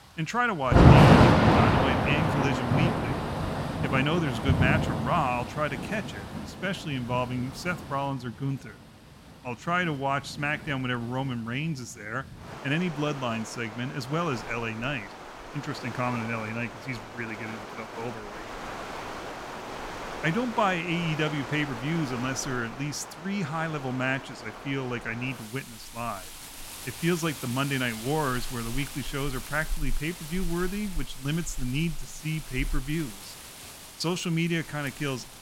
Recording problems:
rain or running water; very loud; throughout; 3 dB above the speech

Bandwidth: 16 kHz